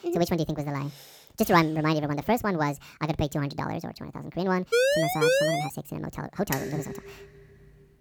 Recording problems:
wrong speed and pitch; too fast and too high; 1.5 times normal speed
siren; loud; at 4.5 s; peak 6 dB above the speech
clattering dishes; noticeable; at 6.5 s; peak 5 dB below the speech

